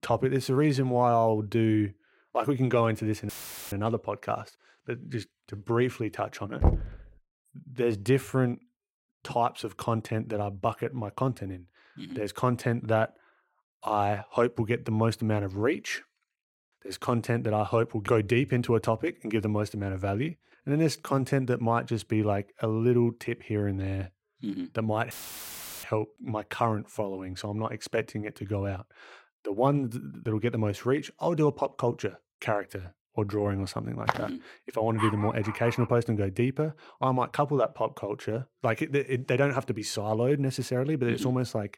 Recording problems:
audio cutting out; filled with static; at 3.5 s and at 25 s for 0.5 s
door banging; loud; at 6.5 s; peak 2 dB above the speech
footsteps; noticeable; at 34 s; peak 3 dB below the speech
dog barking; noticeable; at 35 s; peak 4 dB below the speech

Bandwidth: 16.5 kHz